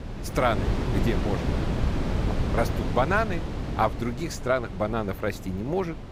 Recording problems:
wind noise on the microphone; heavy; 8 dB below the speech

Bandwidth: 15.5 kHz